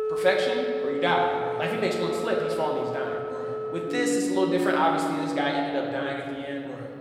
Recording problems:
room echo; noticeable; dies away in 1.9 s
off-mic speech; somewhat distant
background music; loud; throughout; 4 dB below the speech
murmuring crowd; faint; throughout; 30 dB below the speech

